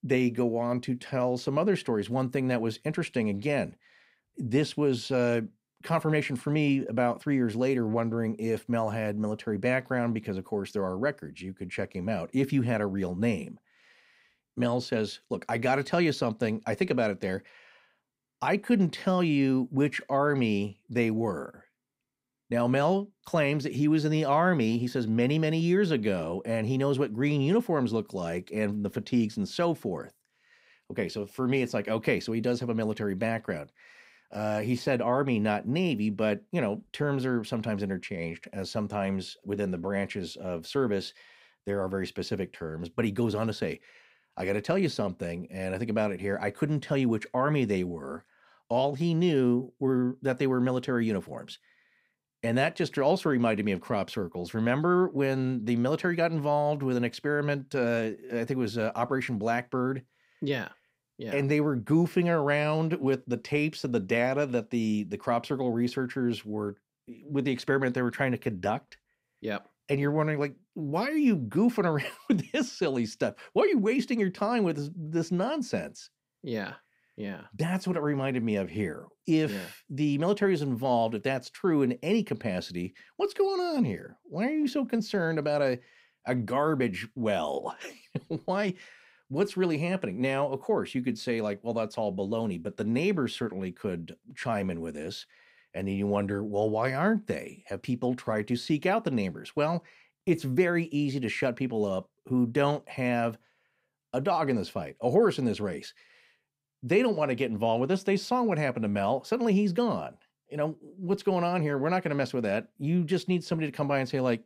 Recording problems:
none

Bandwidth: 15.5 kHz